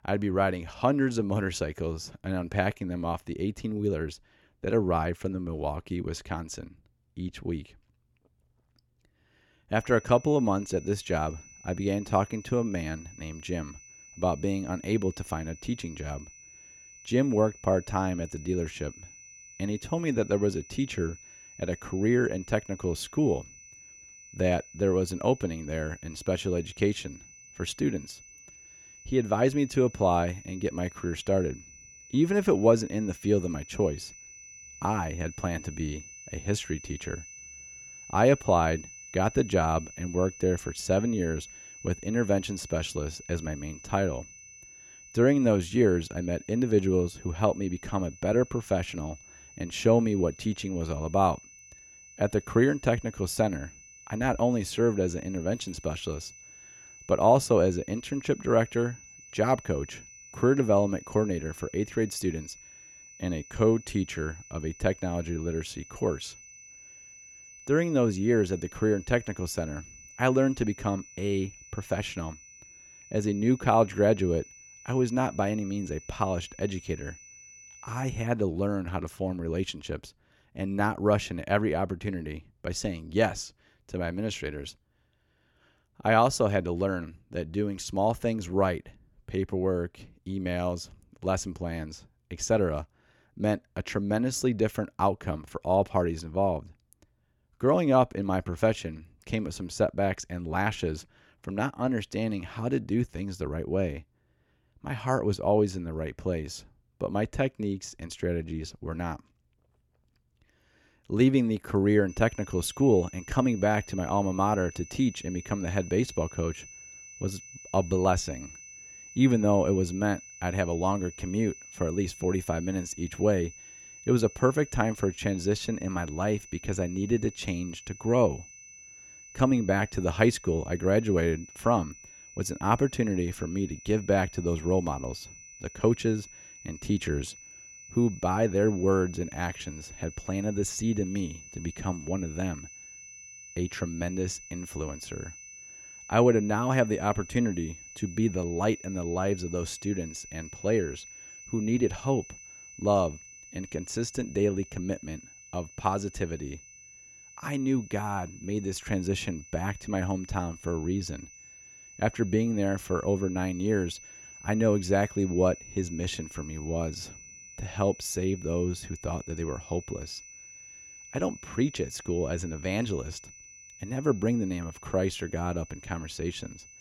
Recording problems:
high-pitched whine; noticeable; from 10 s to 1:18 and from 1:52 on; 6 kHz, 20 dB below the speech

